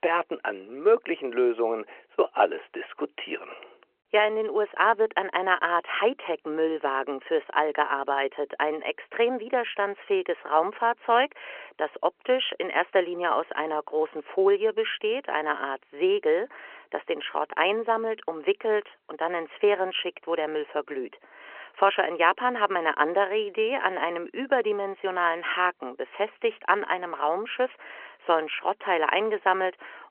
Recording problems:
phone-call audio; nothing above 3 kHz

